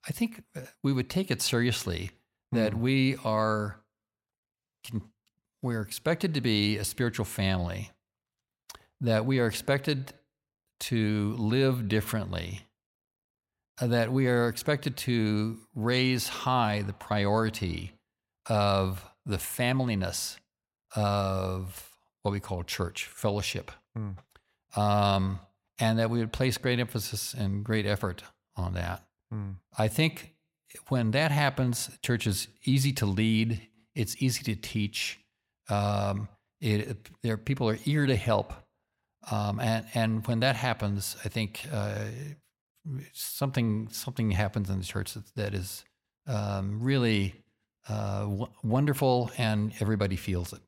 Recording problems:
none

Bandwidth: 16 kHz